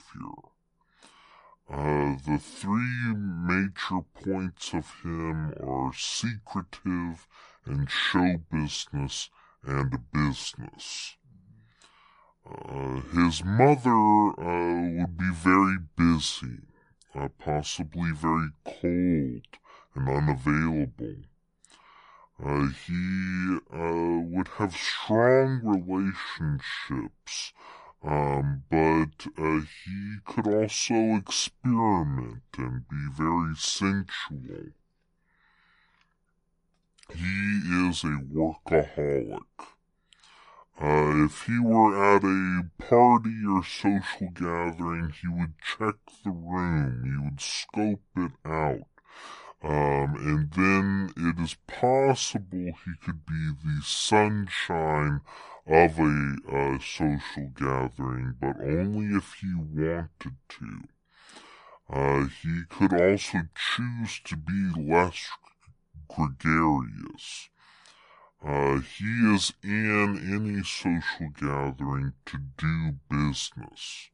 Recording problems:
wrong speed and pitch; too slow and too low; 0.7 times normal speed

